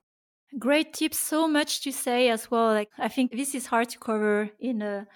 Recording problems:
none

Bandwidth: 18.5 kHz